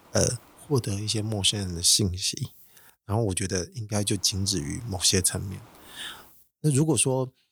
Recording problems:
hiss; faint; until 2 s and from 4 to 6.5 s; 30 dB below the speech

